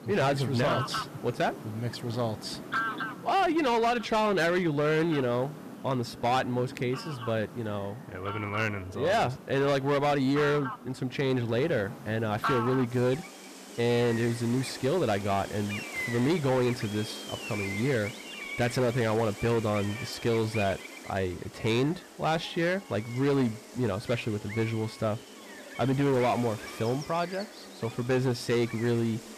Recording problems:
distortion; slight; 9% of the sound clipped
animal sounds; noticeable; throughout; 10 dB below the speech
background chatter; faint; throughout; 2 voices, 25 dB below the speech

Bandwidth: 14.5 kHz